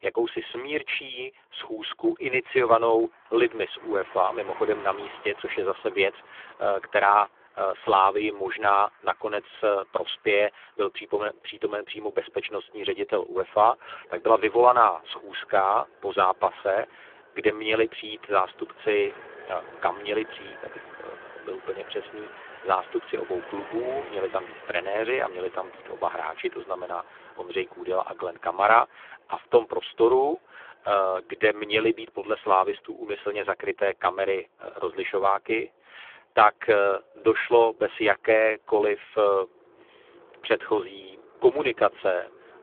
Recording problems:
phone-call audio; poor line; nothing above 3.5 kHz
traffic noise; faint; throughout; 20 dB below the speech

